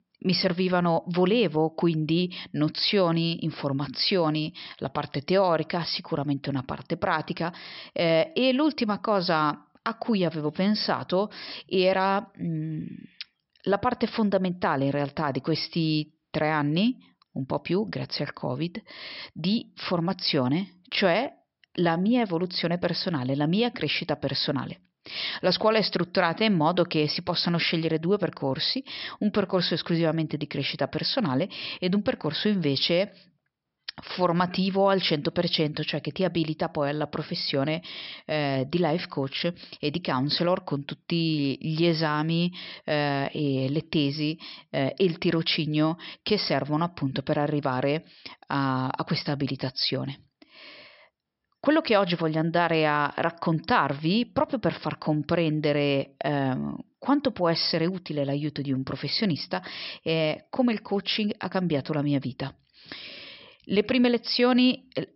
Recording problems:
high frequencies cut off; noticeable; nothing above 5.5 kHz

